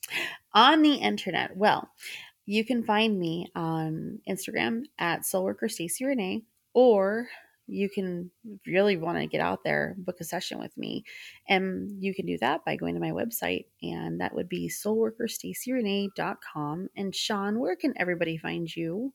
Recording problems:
none

